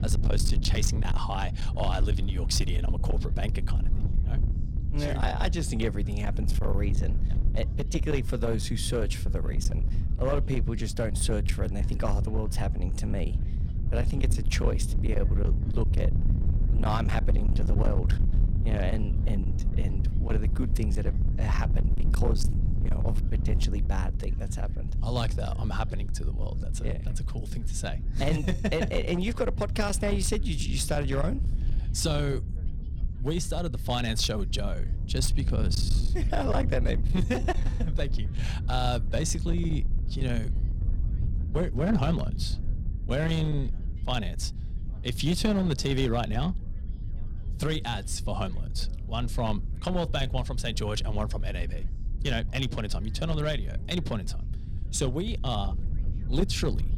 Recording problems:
distortion; slight; 9% of the sound clipped
low rumble; noticeable; throughout; 10 dB below the speech
background chatter; faint; throughout; 3 voices, 30 dB below the speech

